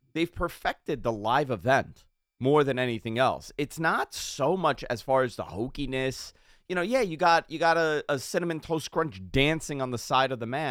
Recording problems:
abrupt cut into speech; at the end

